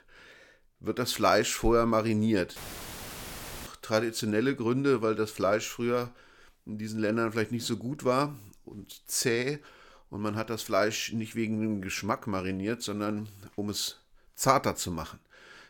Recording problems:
audio cutting out; filled with static; at 2.5 s for 1 s

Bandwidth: 17 kHz